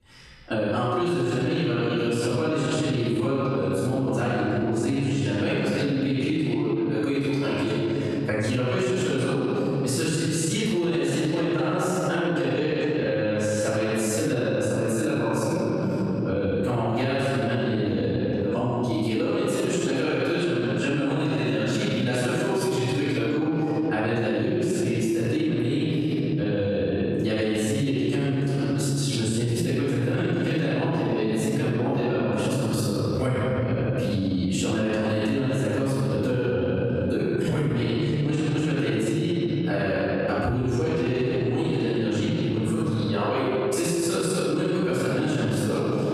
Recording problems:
room echo; strong; dies away in 2.4 s
off-mic speech; far
squashed, flat; somewhat

